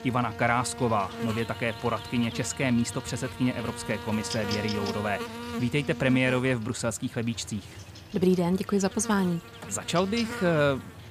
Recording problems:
electrical hum; loud; throughout; 50 Hz, 9 dB below the speech

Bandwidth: 15 kHz